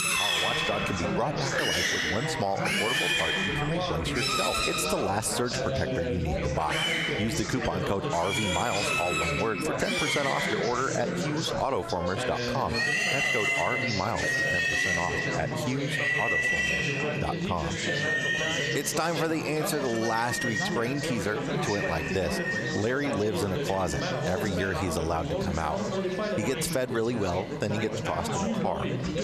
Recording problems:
echo of what is said; faint; throughout; 160 ms later, 25 dB below the speech
squashed, flat; somewhat
animal sounds; very loud; throughout; 3 dB above the speech
background chatter; loud; throughout; 4 voices, 2 dB below the speech
traffic noise; faint; throughout; 20 dB below the speech

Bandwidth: 13.5 kHz